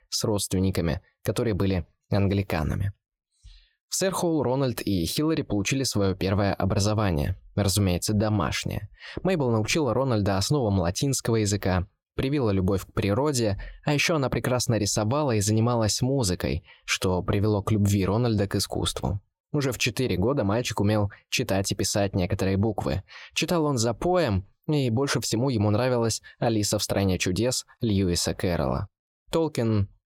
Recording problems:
none

